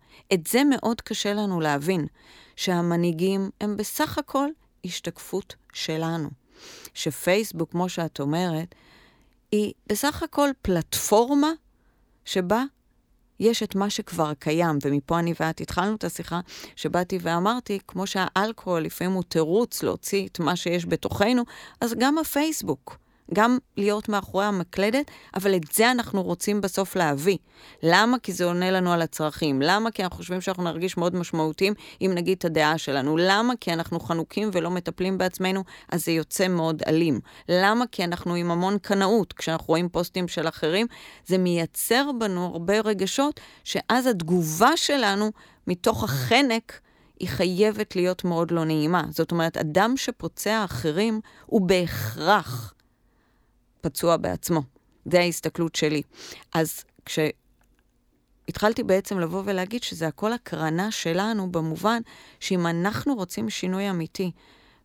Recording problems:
none

